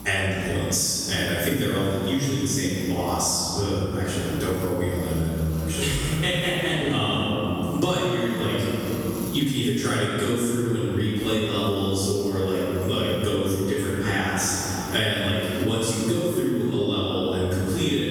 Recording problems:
room echo; strong; dies away in 2.2 s
off-mic speech; far
squashed, flat; somewhat
electrical hum; noticeable; throughout; 60 Hz, 20 dB below the speech

